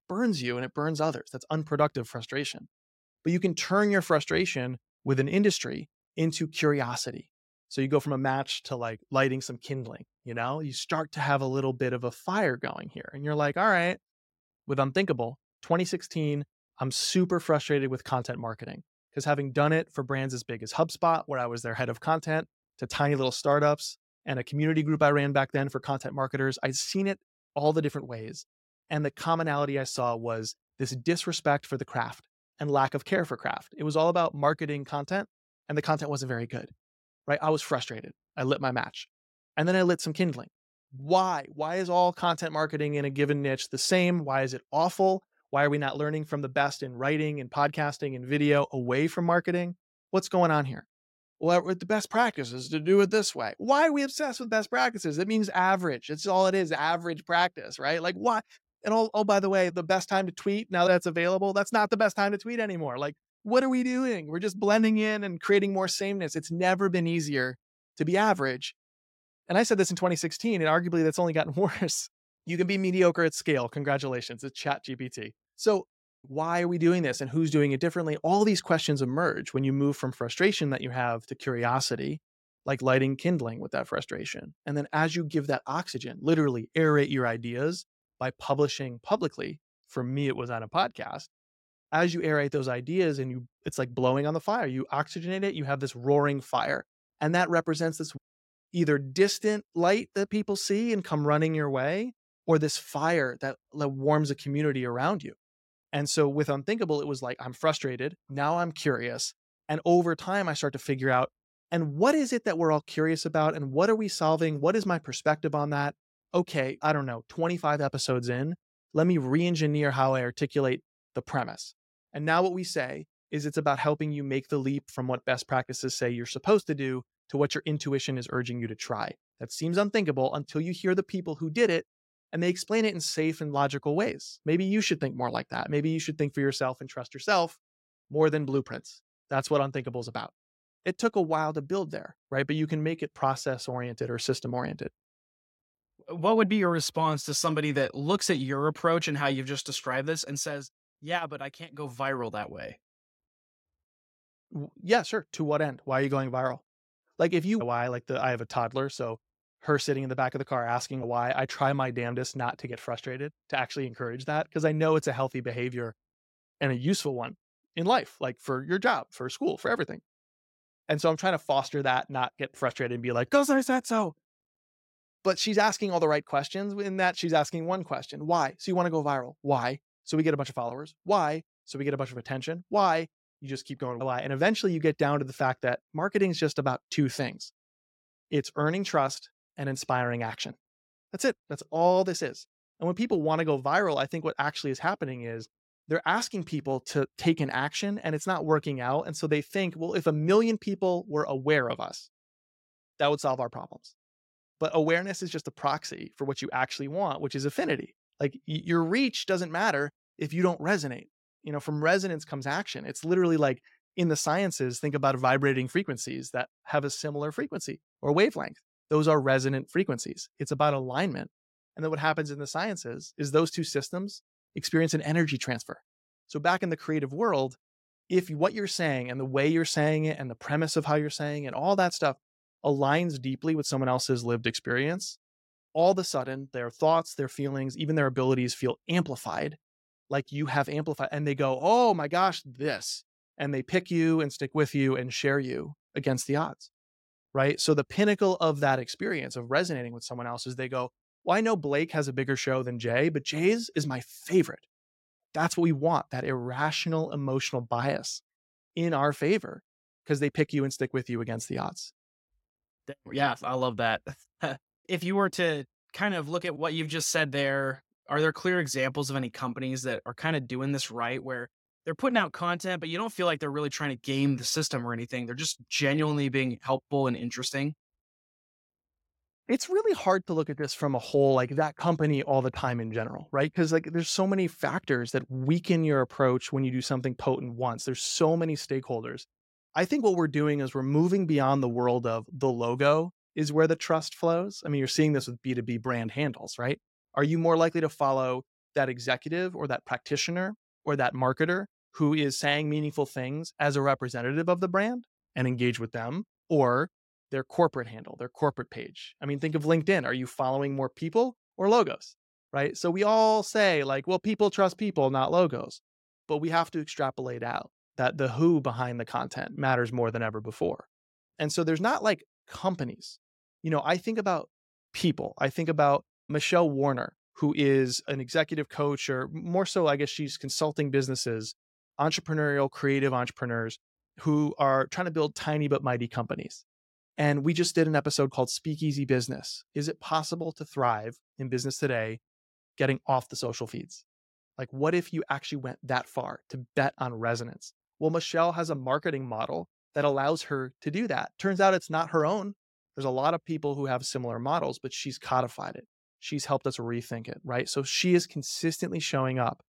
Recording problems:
none

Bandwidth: 16 kHz